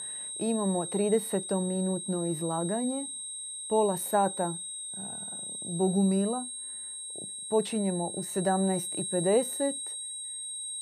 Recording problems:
high-pitched whine; loud; throughout; 8.5 kHz, 6 dB below the speech

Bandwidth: 14.5 kHz